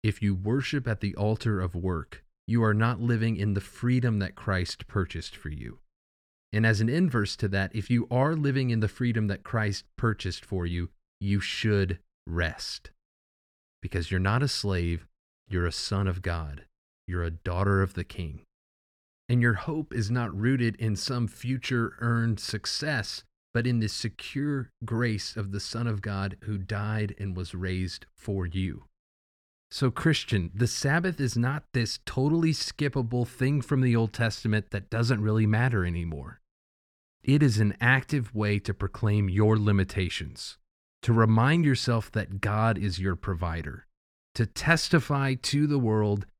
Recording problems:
none

